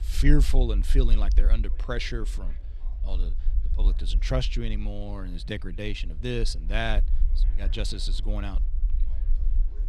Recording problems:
low rumble; noticeable; throughout; 20 dB below the speech
murmuring crowd; faint; throughout; 30 dB below the speech

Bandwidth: 14 kHz